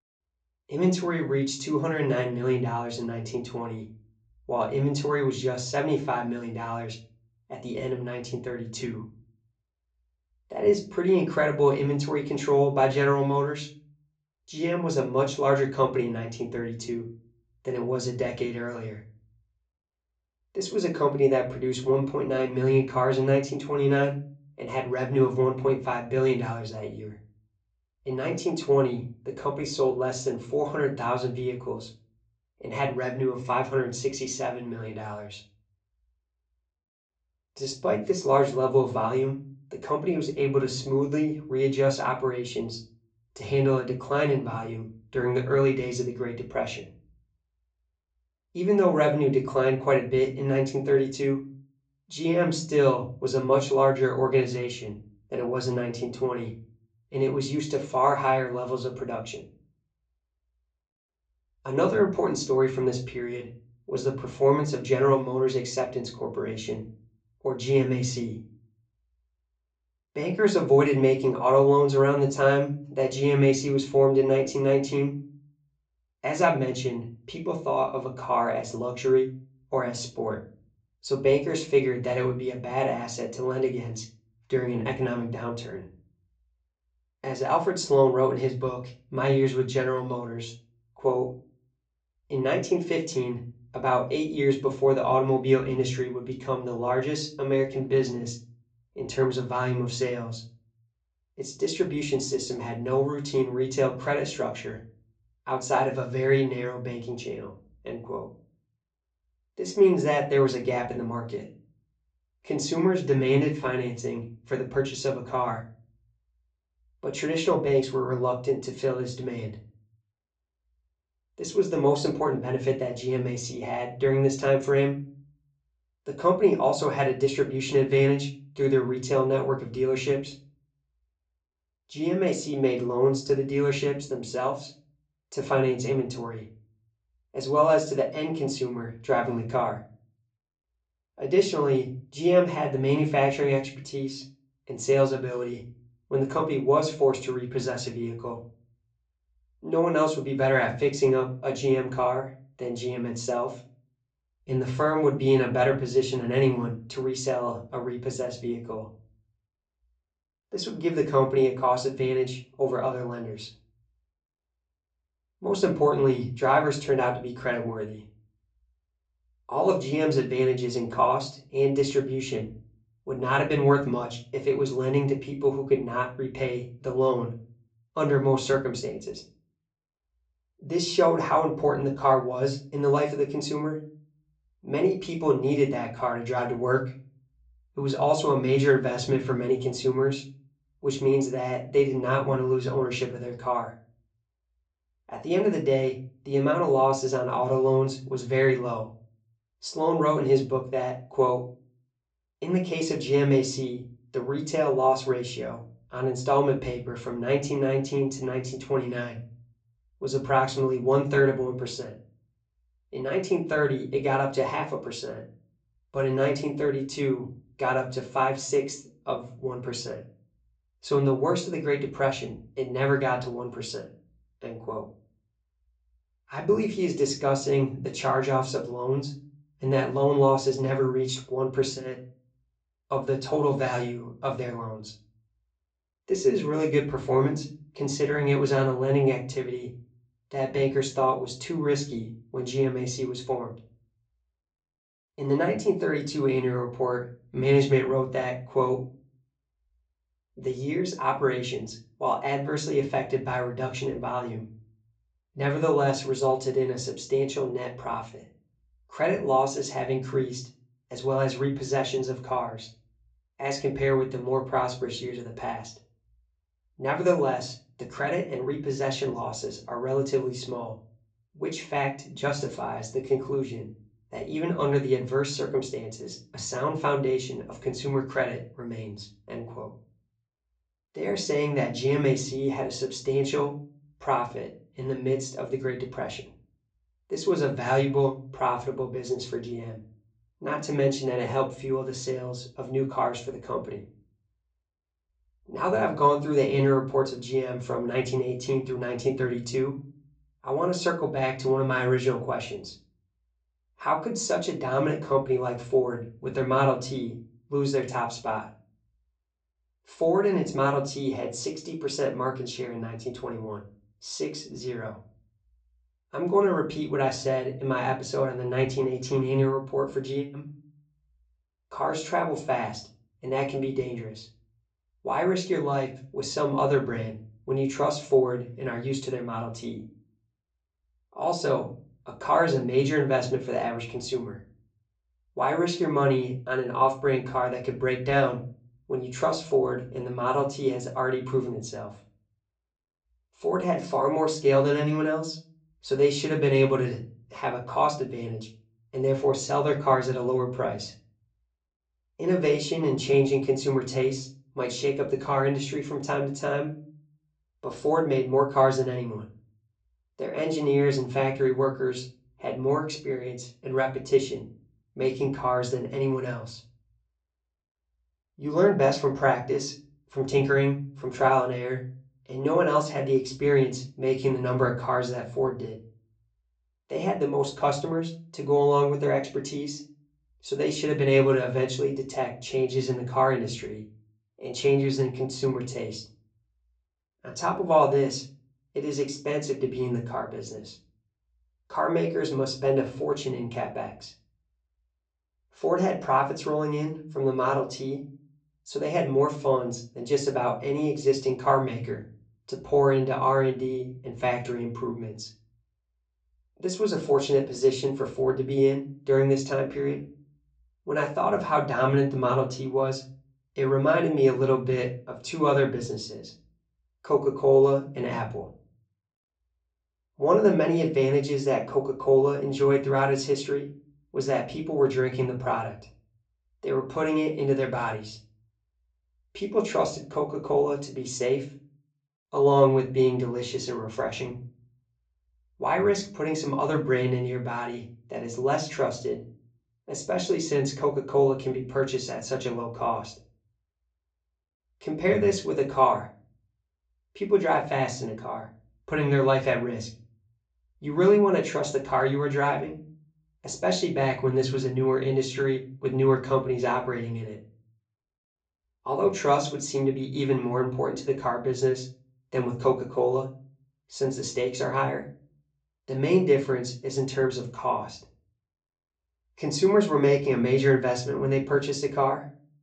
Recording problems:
off-mic speech; far
high frequencies cut off; noticeable; nothing above 8 kHz
room echo; very slight; dies away in 0.3 s

